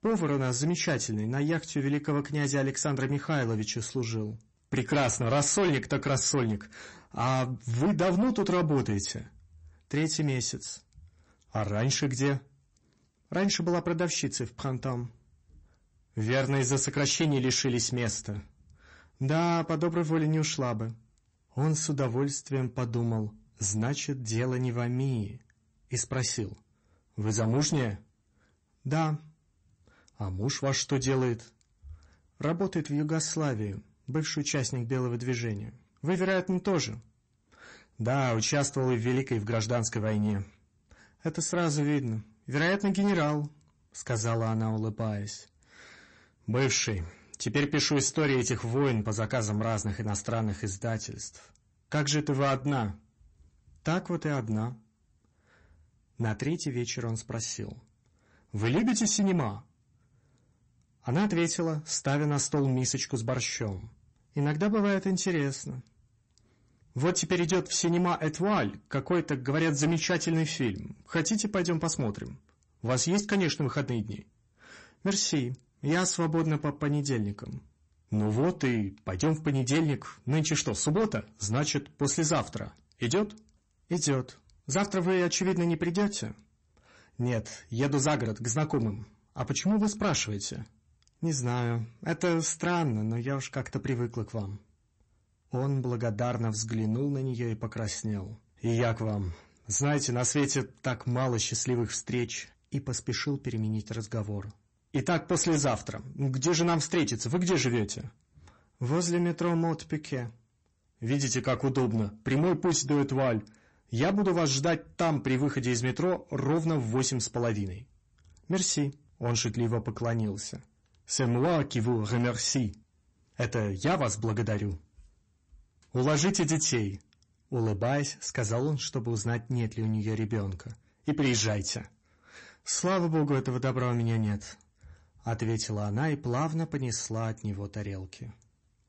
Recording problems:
distortion; slight; 10 dB below the speech
garbled, watery; slightly; nothing above 8 kHz

